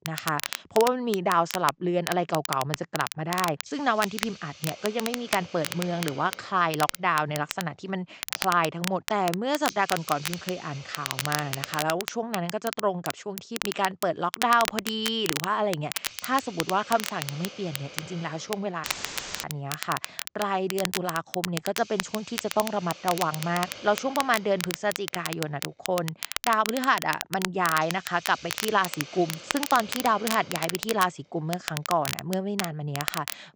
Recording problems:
high frequencies cut off; noticeable; nothing above 8 kHz
crackle, like an old record; loud; 6 dB below the speech
hiss; noticeable; from 3 to 12 s and from 16 s on; 15 dB below the speech
audio cutting out; filled with static; at 19 s for 0.5 s

